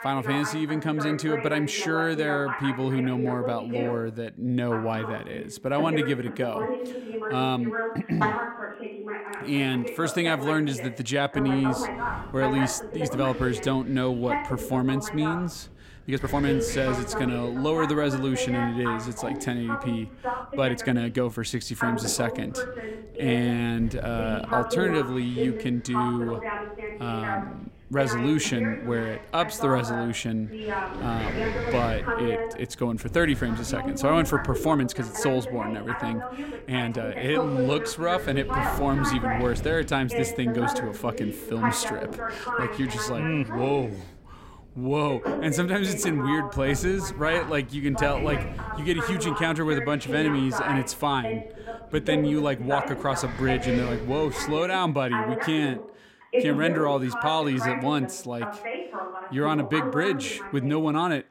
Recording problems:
voice in the background; loud; throughout; 5 dB below the speech
wind noise on the microphone; occasional gusts; from 11 to 55 s; 15 dB below the speech
uneven, jittery; strongly; from 13 to 43 s

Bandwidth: 16 kHz